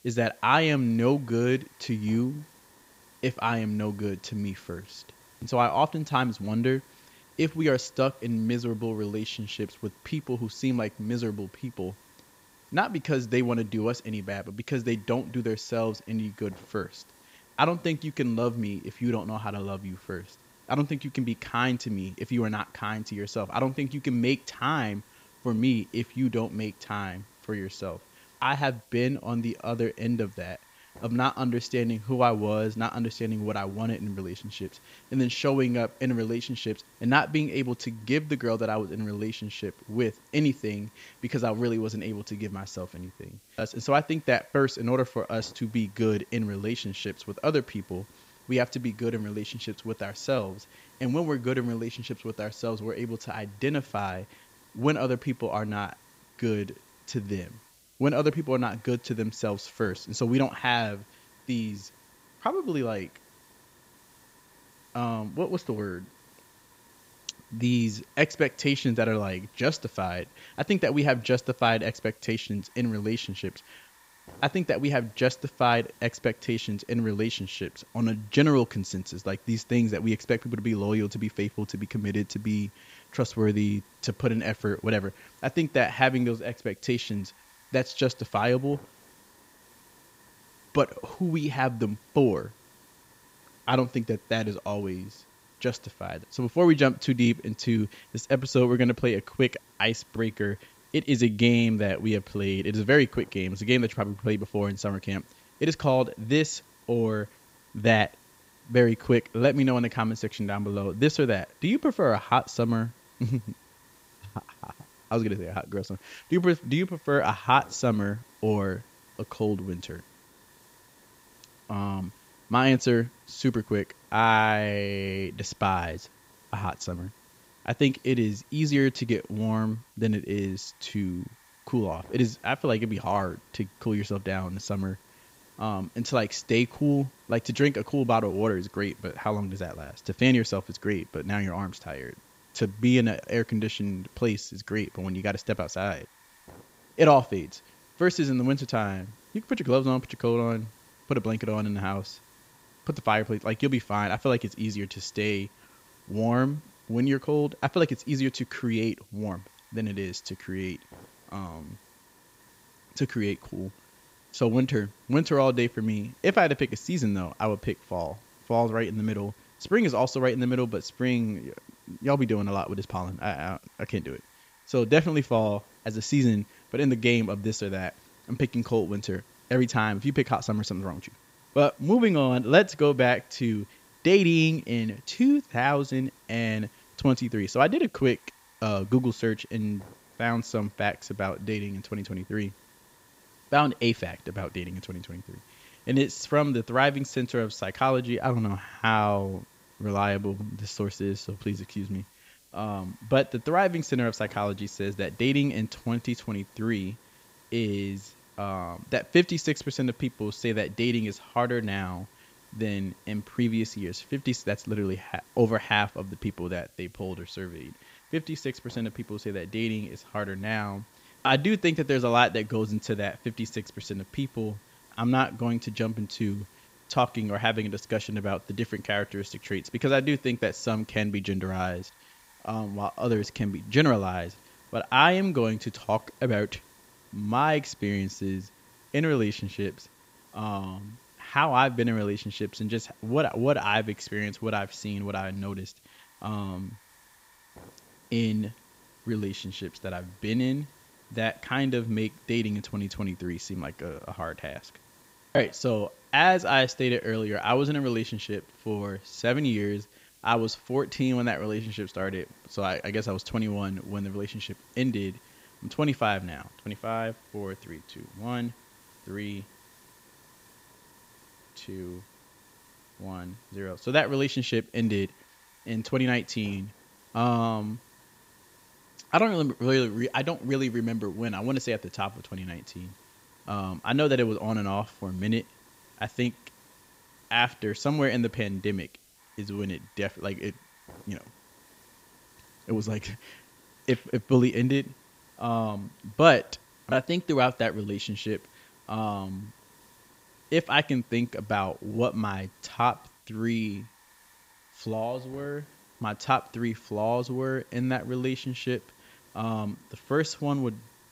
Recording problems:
high frequencies cut off; noticeable; nothing above 8 kHz
hiss; faint; throughout; 25 dB below the speech

